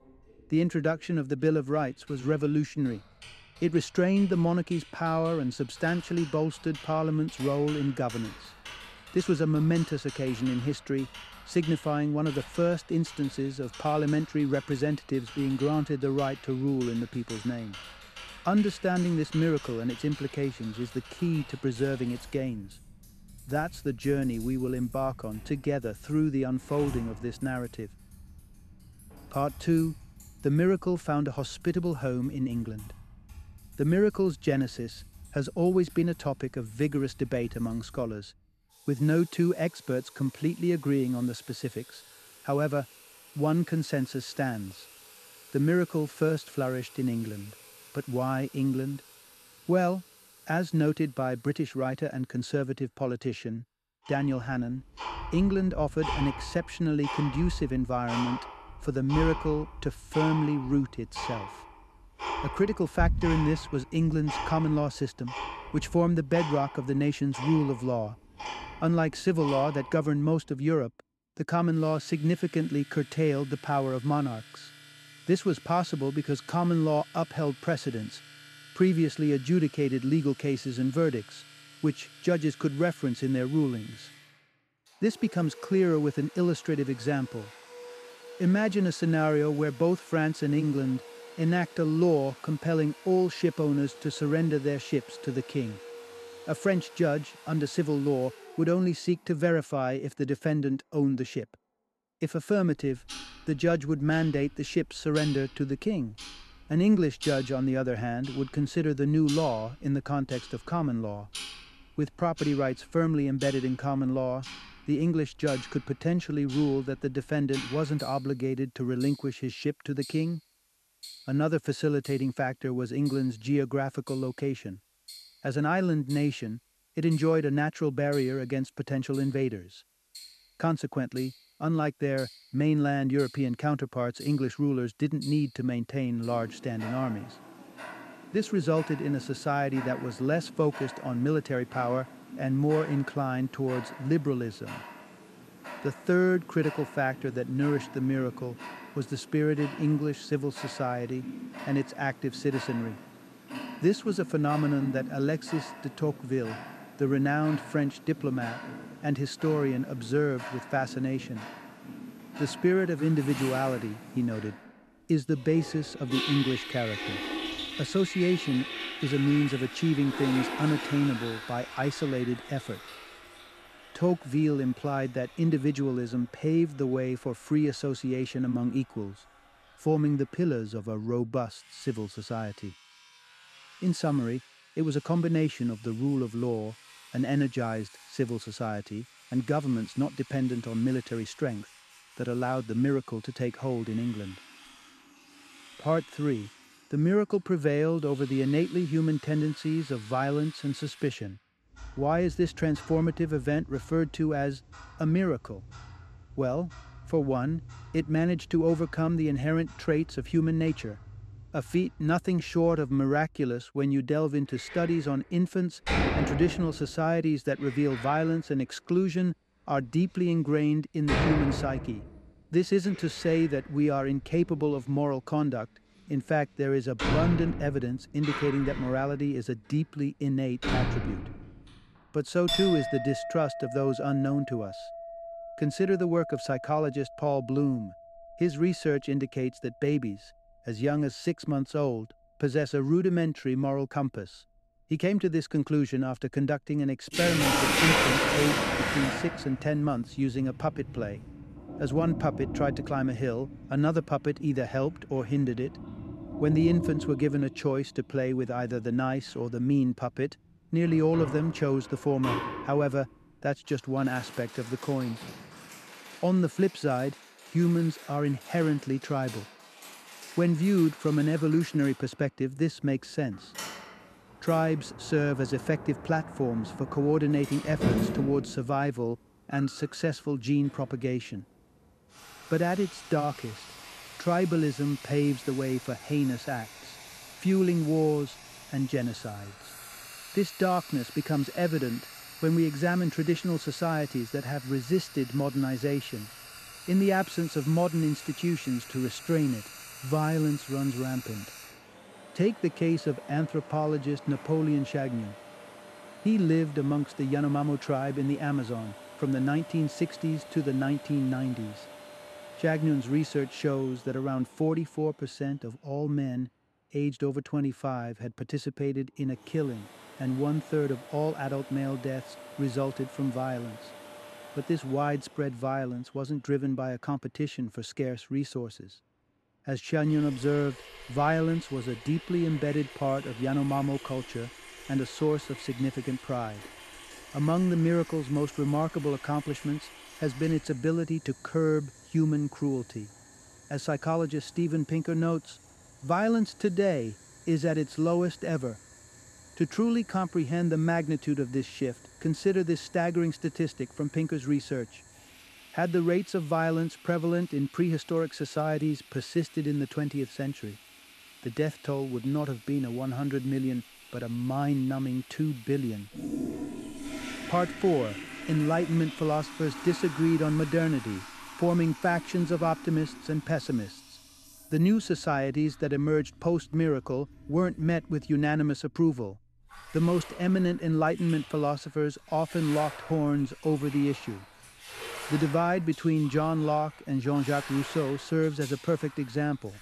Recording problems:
household noises; noticeable; throughout; 10 dB below the speech

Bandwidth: 13.5 kHz